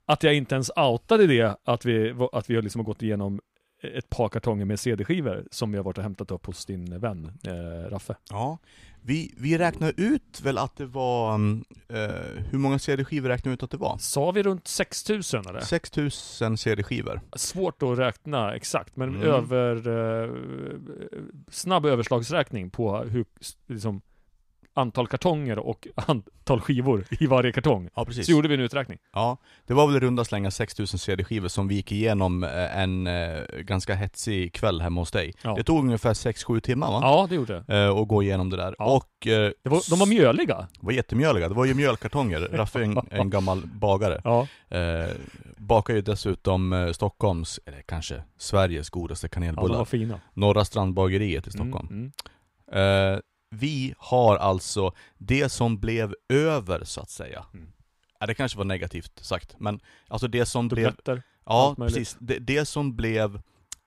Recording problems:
none

